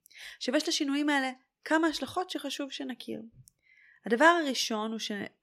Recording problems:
none

